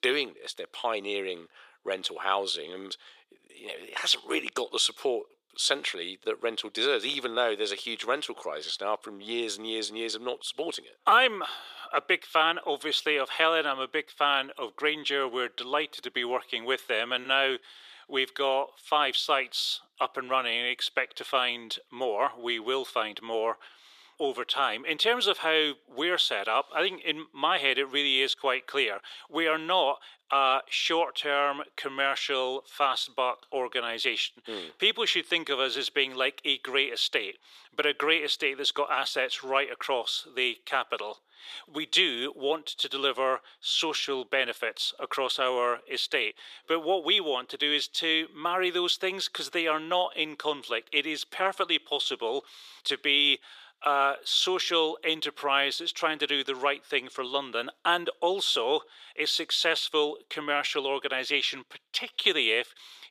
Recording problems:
thin; very; fading below 400 Hz

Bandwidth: 14.5 kHz